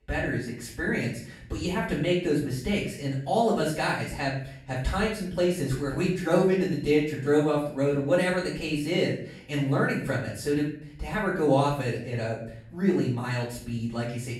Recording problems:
off-mic speech; far
room echo; noticeable; dies away in 0.5 s

